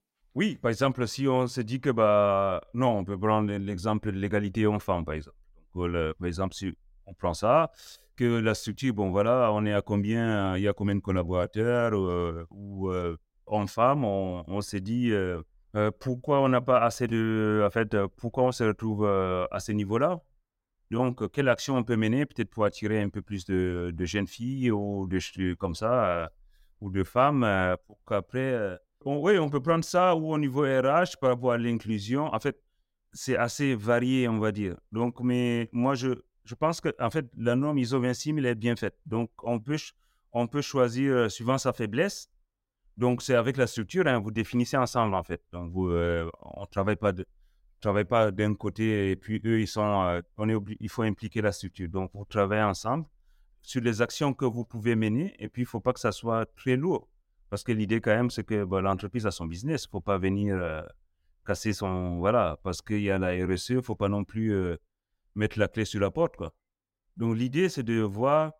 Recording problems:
none

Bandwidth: 16 kHz